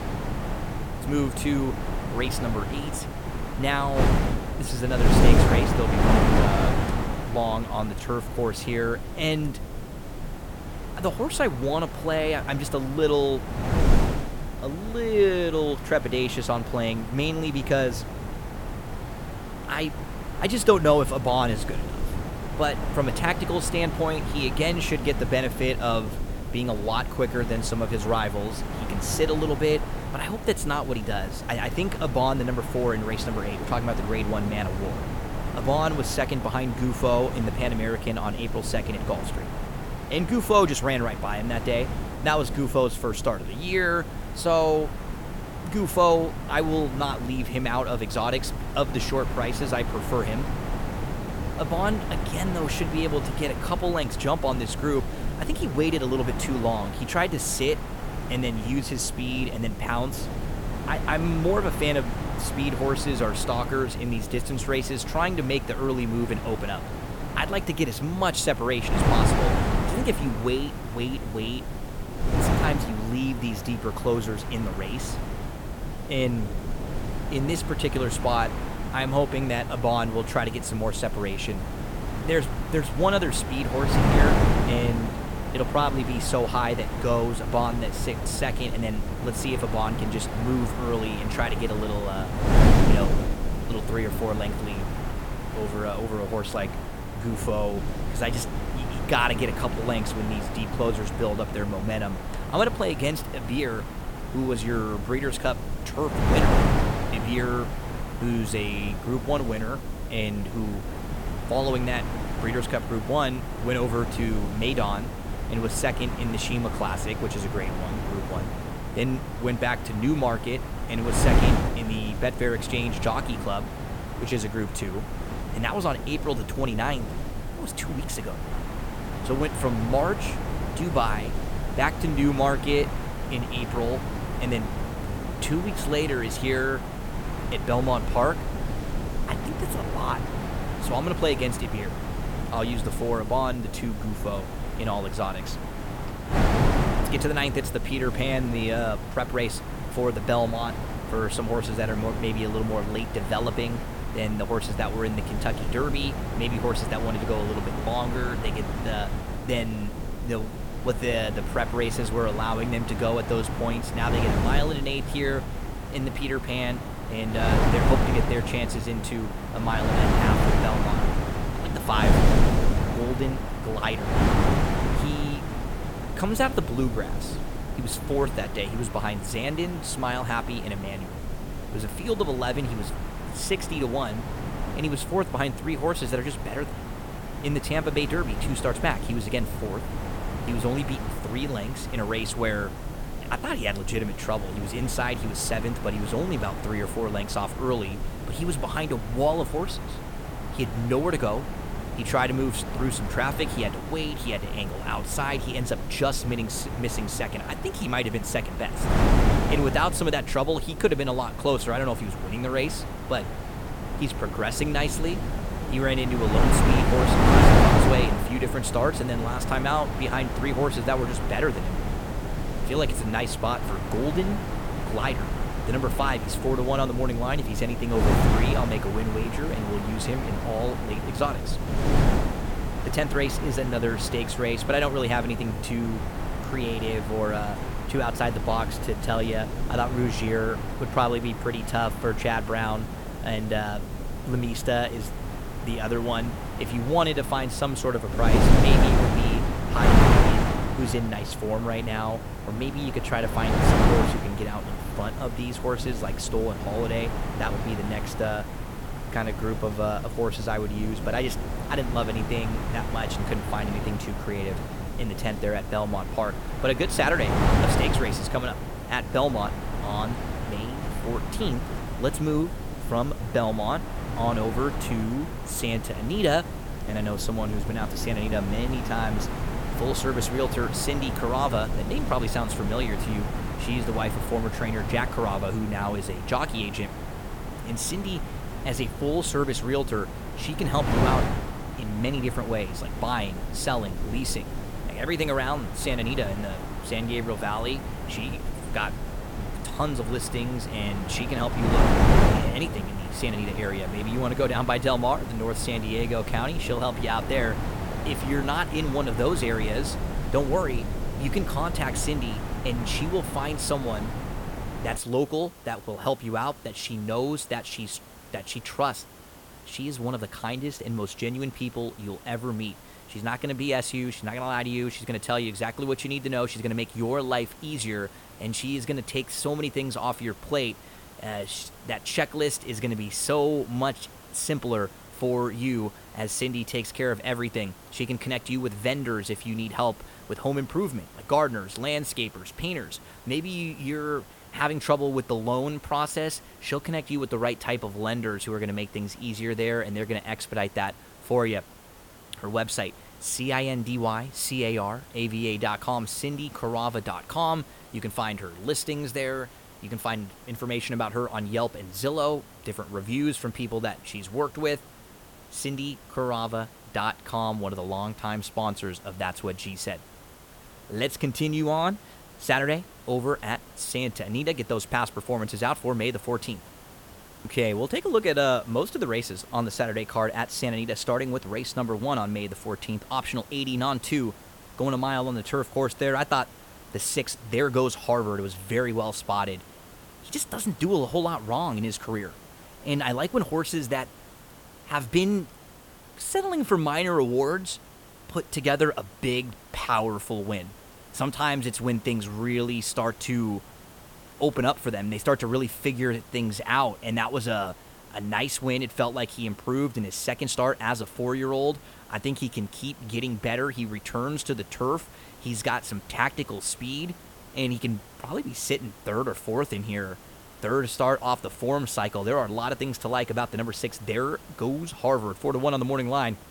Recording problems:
wind noise on the microphone; heavy; until 5:15; 5 dB below the speech
hiss; noticeable; throughout; 20 dB below the speech

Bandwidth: 18 kHz